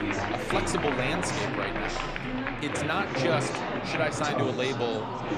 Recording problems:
chatter from many people; very loud; throughout; 1 dB above the speech

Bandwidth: 14 kHz